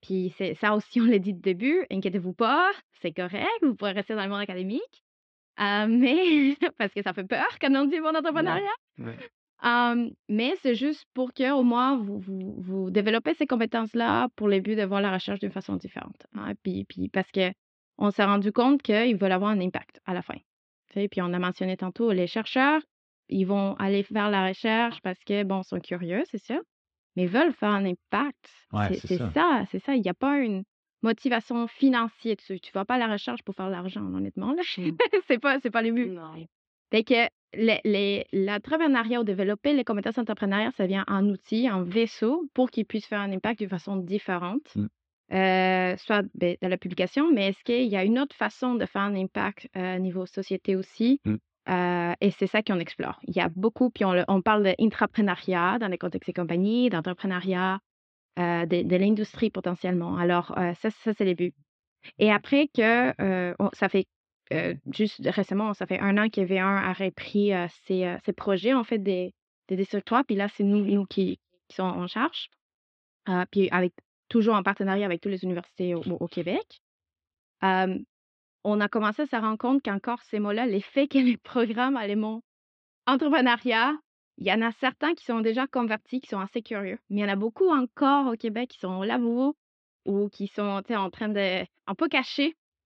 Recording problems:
muffled; slightly; fading above 3.5 kHz

